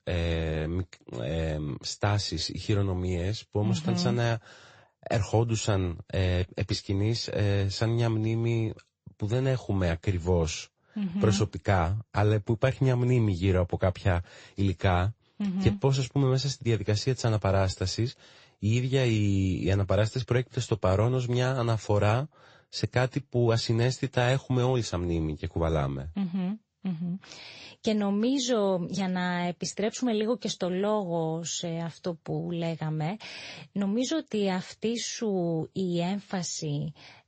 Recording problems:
garbled, watery; slightly; nothing above 7.5 kHz
high frequencies cut off; slight

